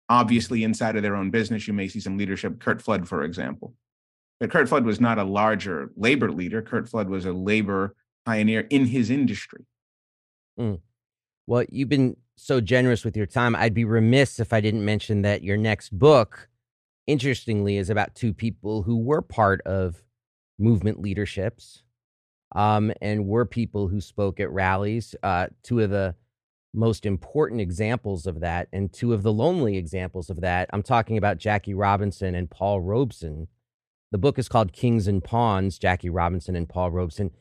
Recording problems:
none

